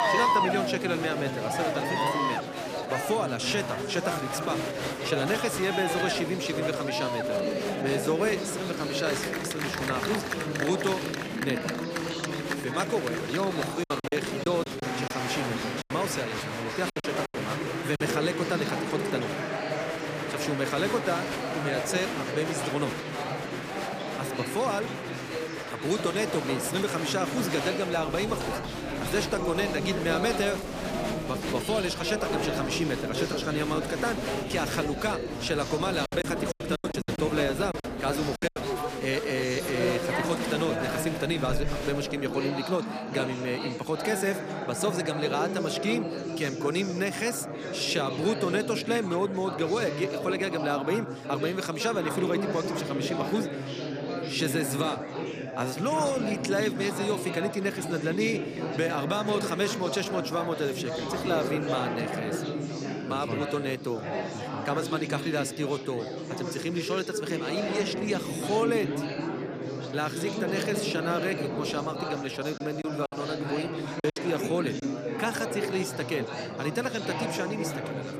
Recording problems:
chatter from many people; loud; throughout; 1 dB below the speech
choppy; very; from 14 to 18 s, from 36 to 39 s and from 1:13 to 1:14; 13% of the speech affected

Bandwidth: 15 kHz